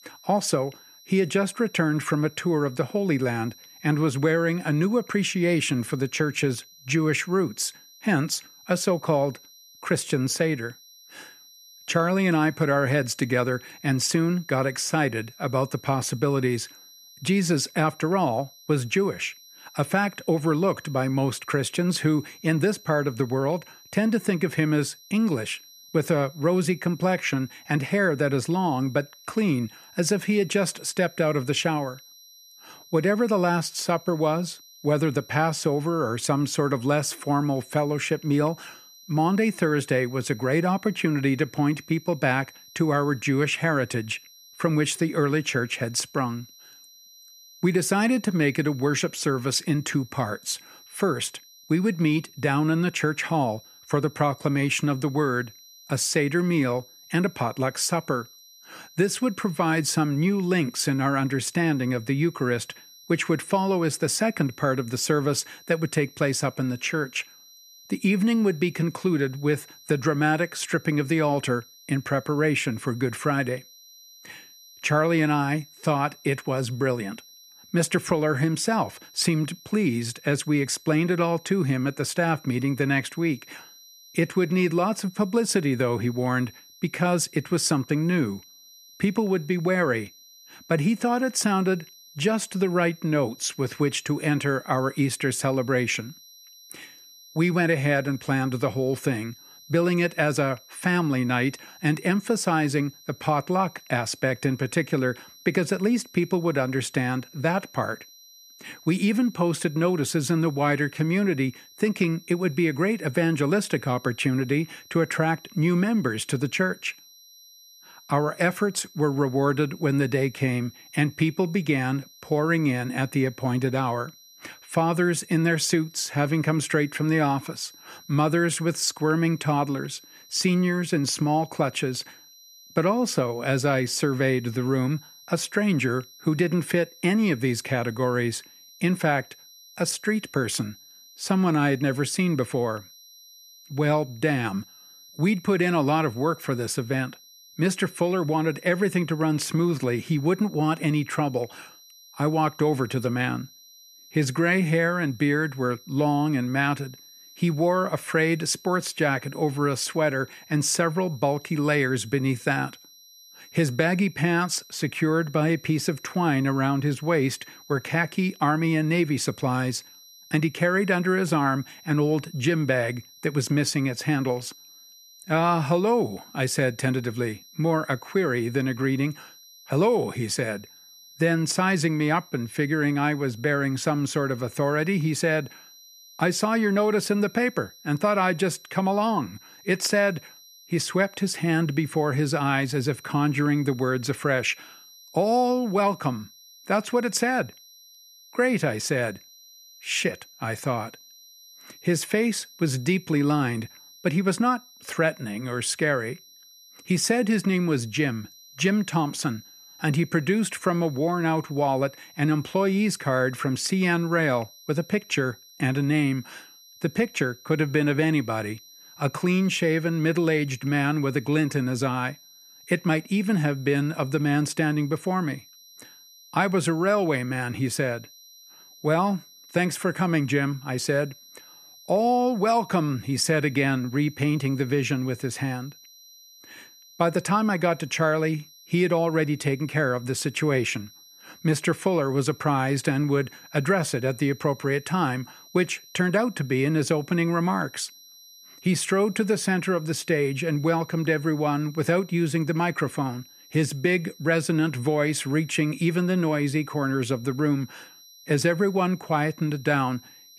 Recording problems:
high-pitched whine; faint; throughout; 4 kHz, 25 dB below the speech

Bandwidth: 14.5 kHz